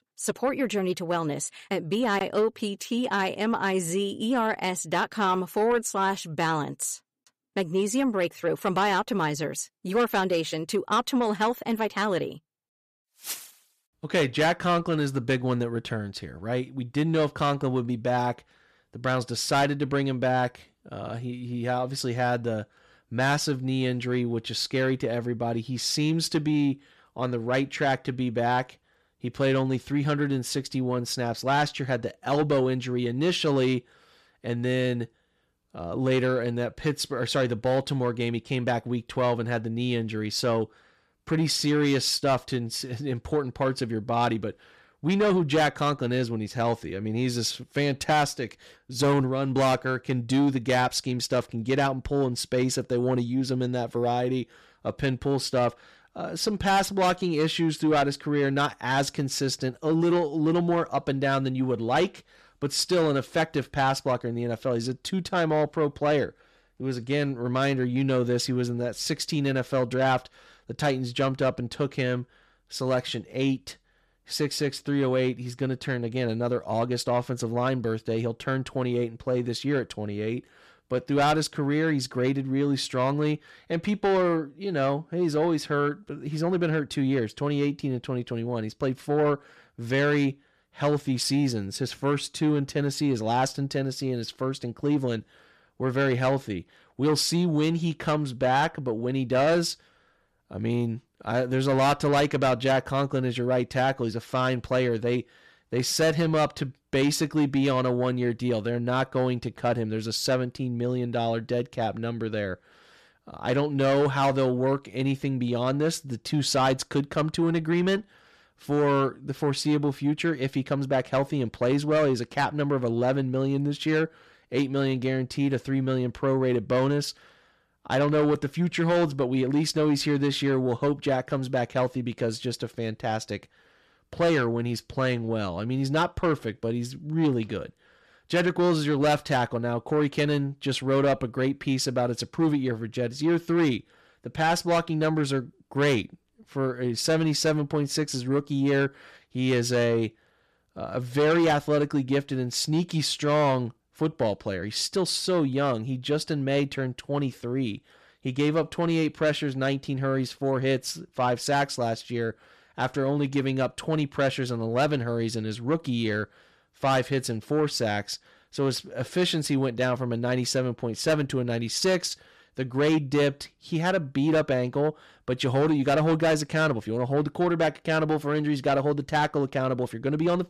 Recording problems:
distortion; slight; 10 dB below the speech

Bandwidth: 14.5 kHz